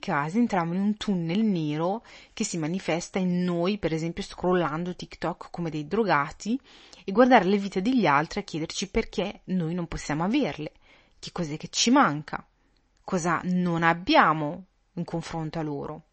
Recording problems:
garbled, watery; slightly; nothing above 7 kHz

